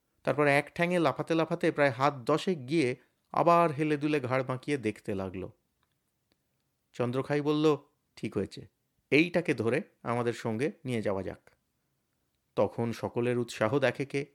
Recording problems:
none

